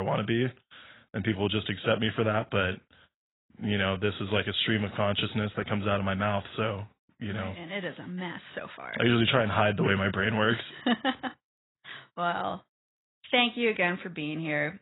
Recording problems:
garbled, watery; badly; nothing above 3.5 kHz
abrupt cut into speech; at the start

